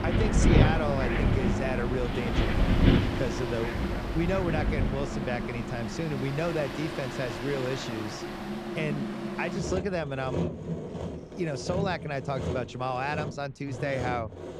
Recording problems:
wind in the background; very loud; throughout; 4 dB above the speech
machinery noise; loud; throughout; 3 dB below the speech

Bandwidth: 15 kHz